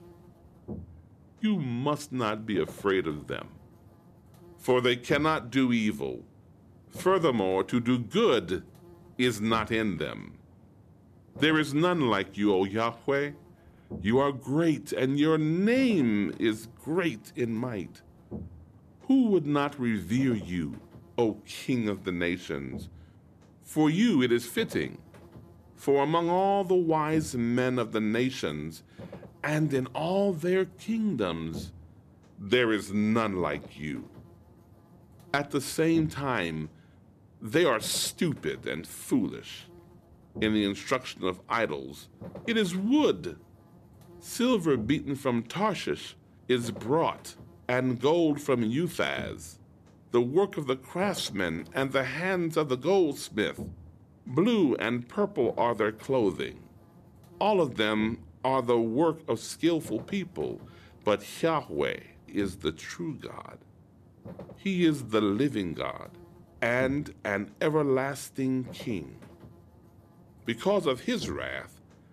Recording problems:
electrical hum; faint; throughout; 50 Hz, 25 dB below the speech

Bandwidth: 14.5 kHz